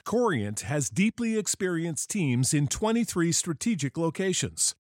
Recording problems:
none

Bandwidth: 16 kHz